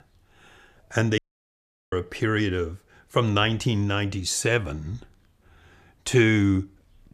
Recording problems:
audio cutting out; at 1 s for 0.5 s

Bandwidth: 14.5 kHz